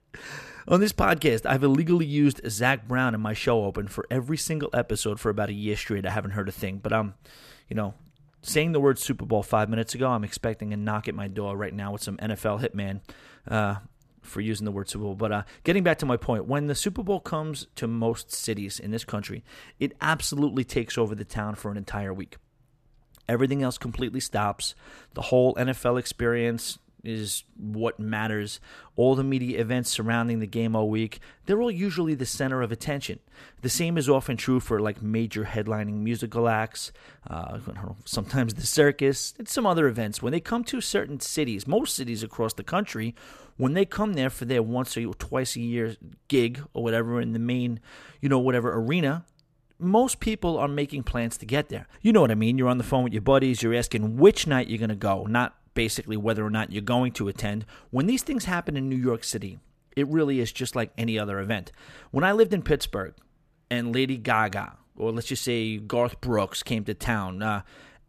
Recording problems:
none

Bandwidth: 14.5 kHz